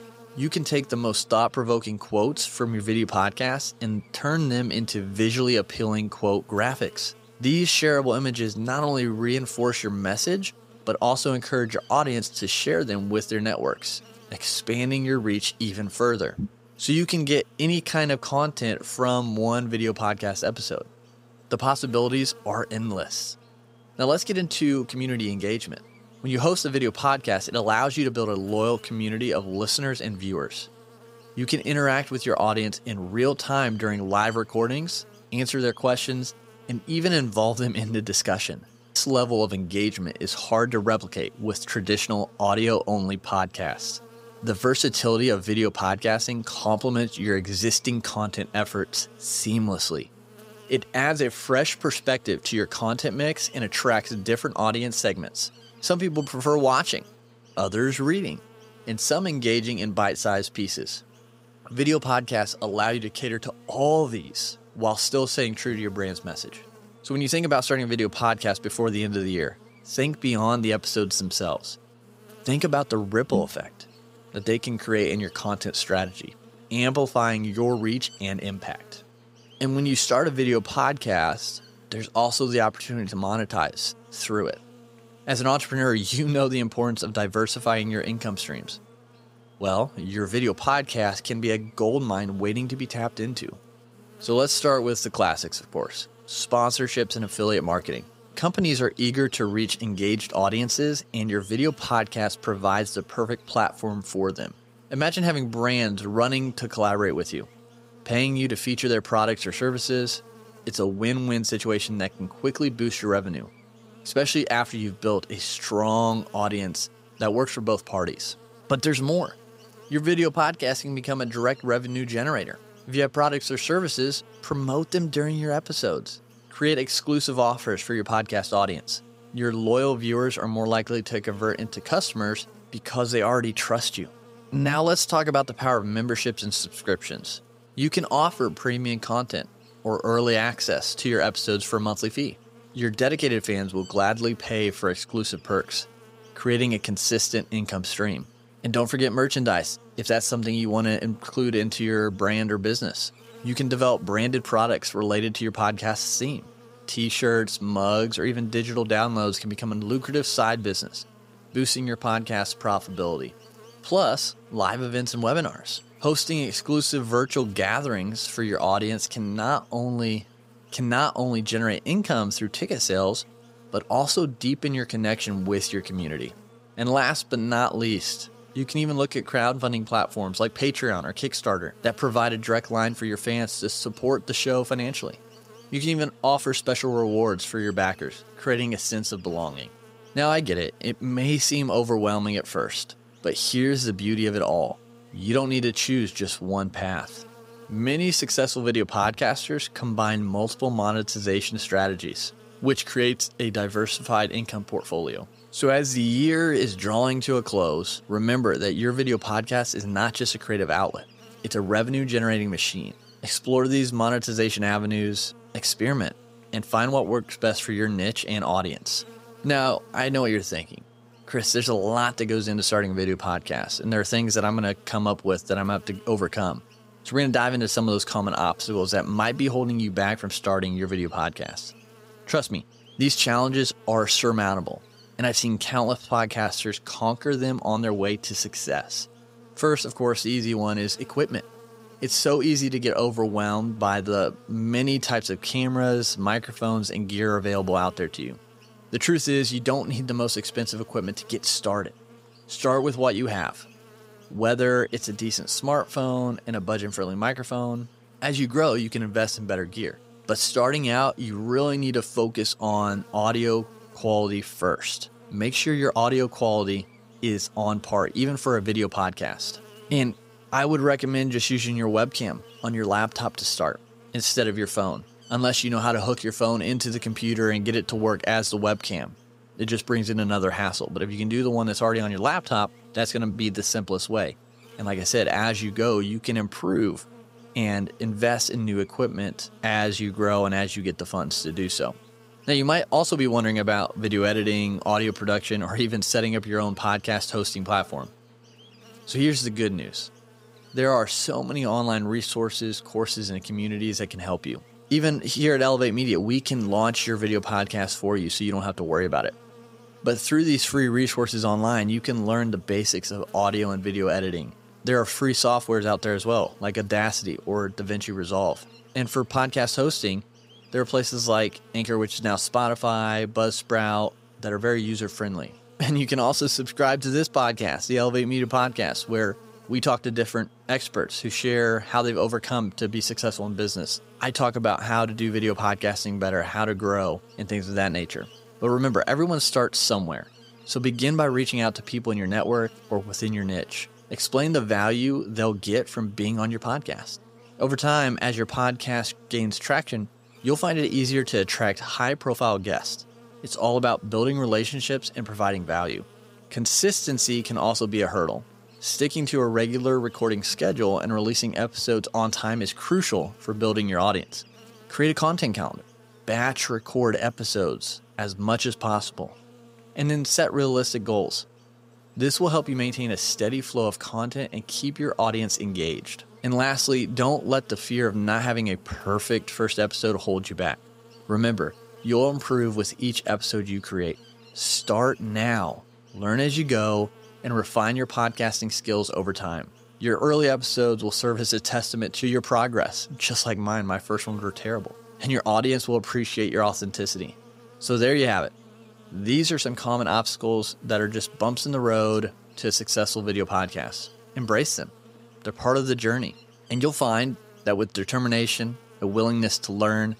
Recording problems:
electrical hum; faint; throughout; 60 Hz, 25 dB below the speech

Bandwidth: 15.5 kHz